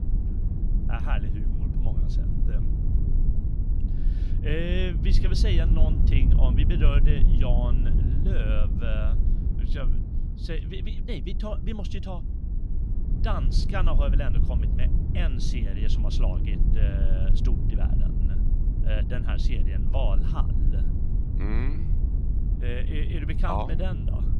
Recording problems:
low rumble; loud; throughout; 6 dB below the speech

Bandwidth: 14.5 kHz